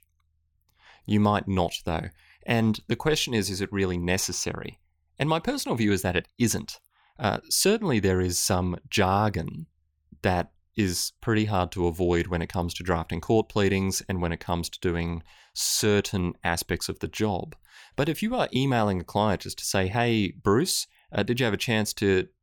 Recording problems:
none

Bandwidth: 18 kHz